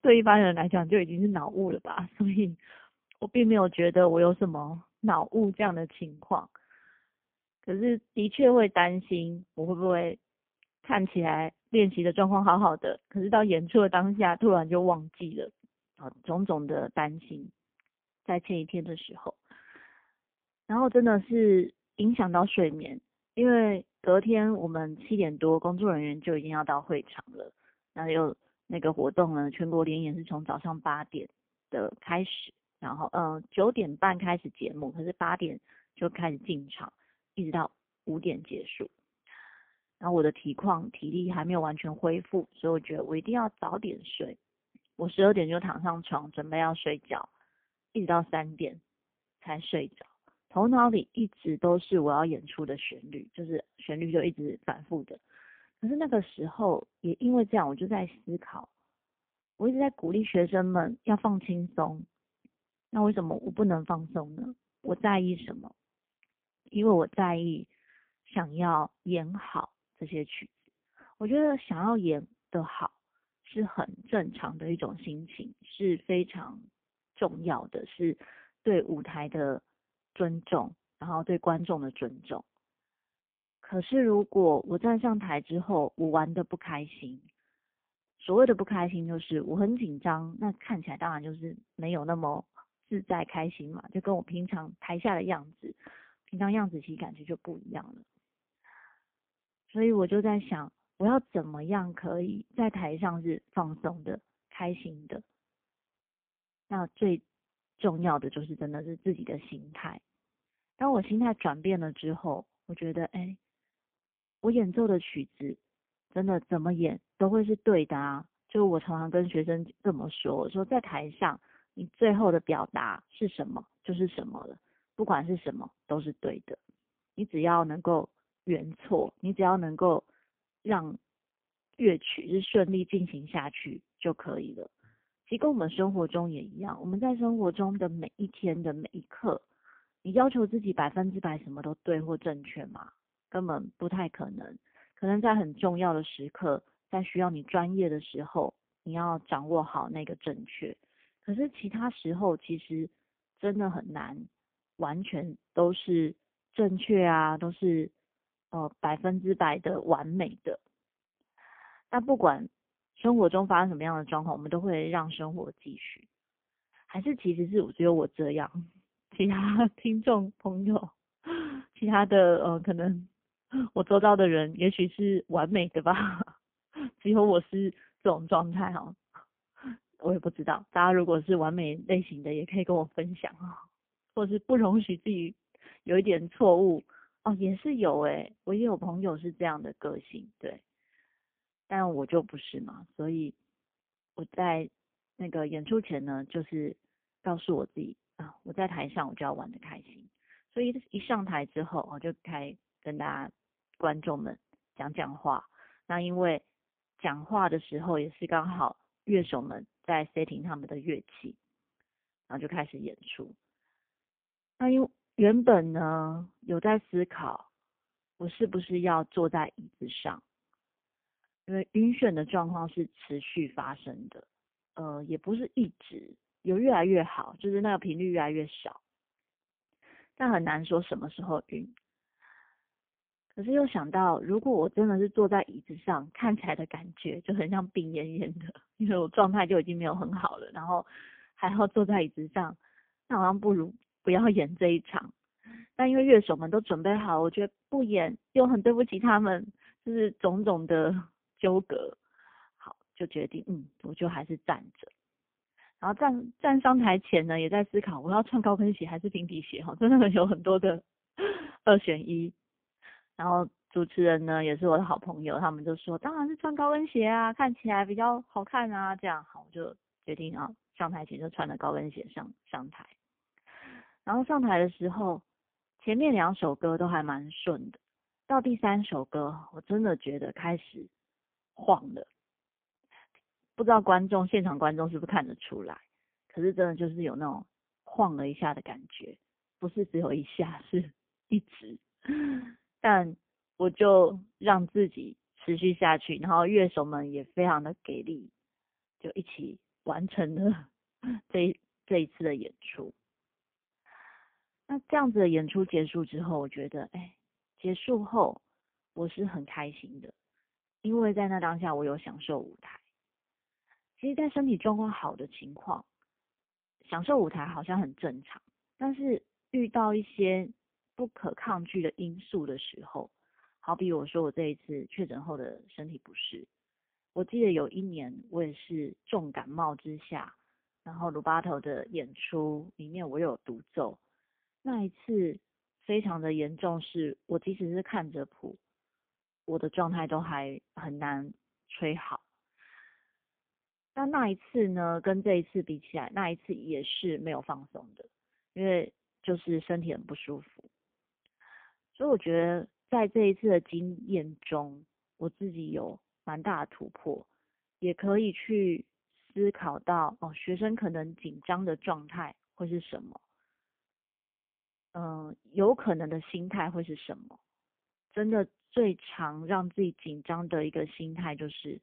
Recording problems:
phone-call audio; poor line; nothing above 3.5 kHz

